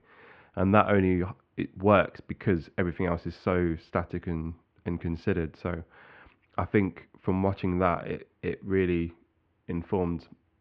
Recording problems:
muffled; very; fading above 2.5 kHz

